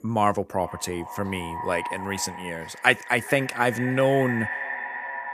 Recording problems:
echo of what is said; strong; throughout; 420 ms later, 8 dB below the speech

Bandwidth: 15 kHz